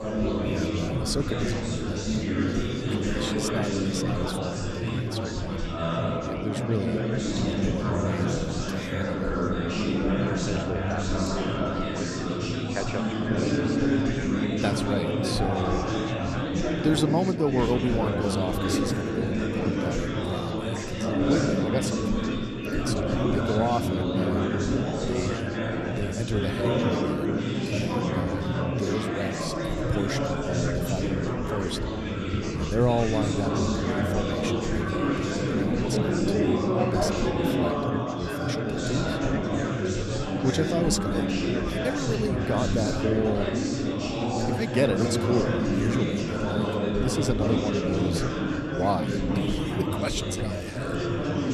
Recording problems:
chatter from many people; very loud; throughout; 4 dB above the speech

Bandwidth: 13.5 kHz